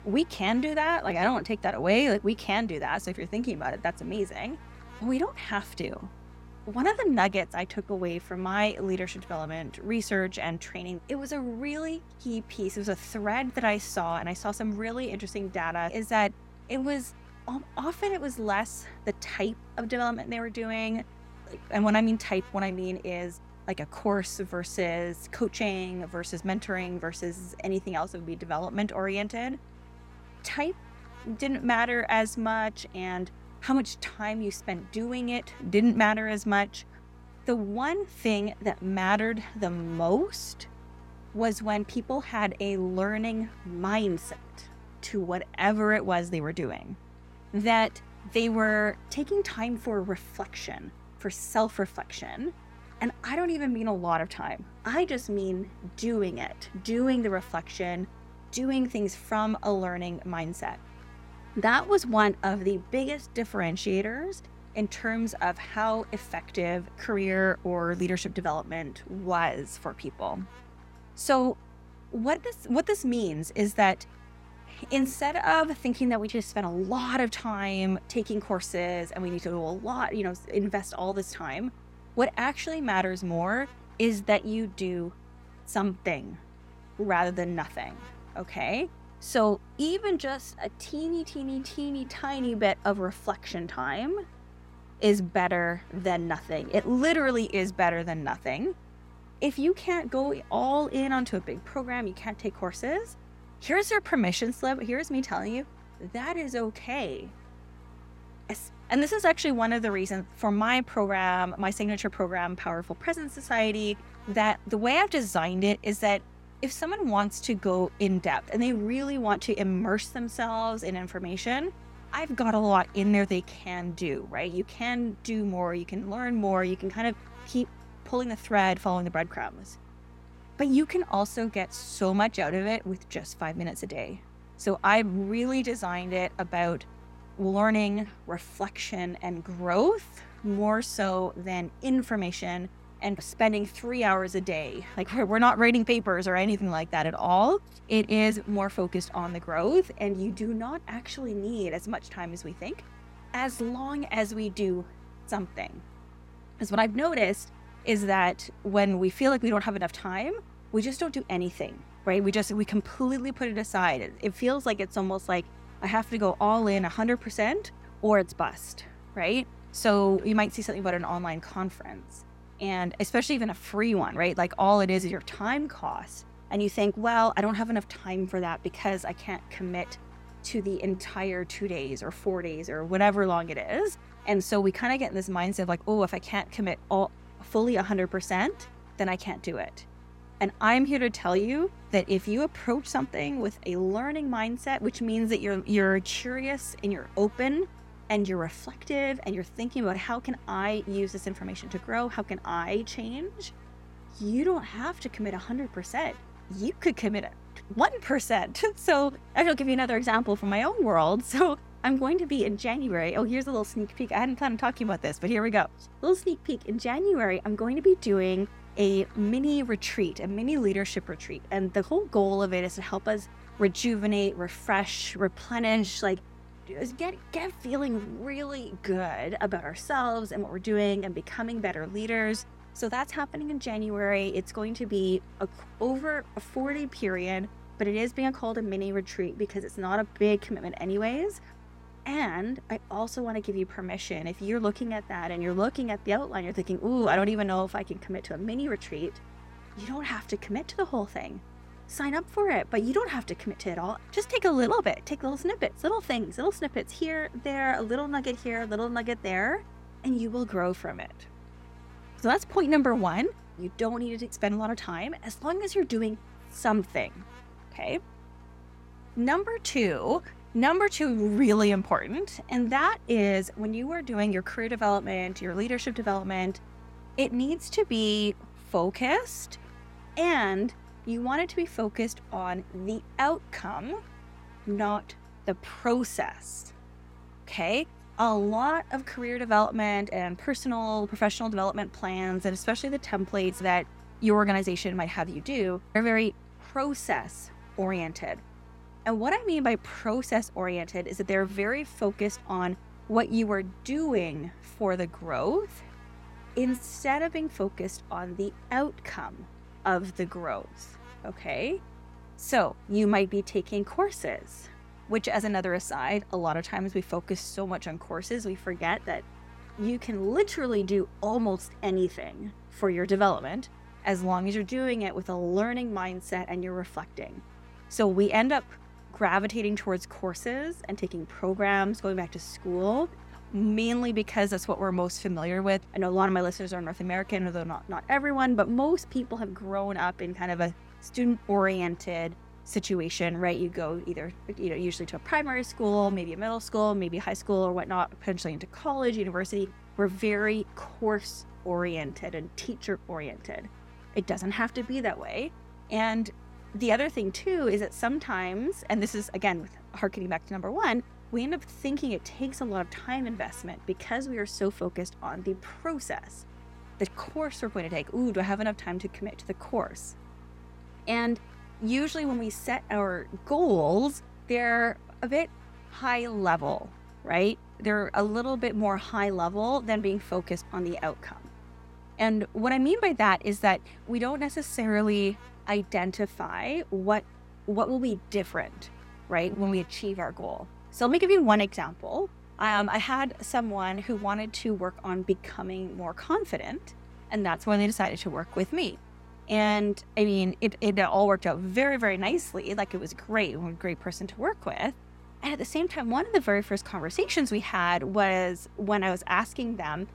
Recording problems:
electrical hum; faint; throughout; 60 Hz, 25 dB below the speech

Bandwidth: 16 kHz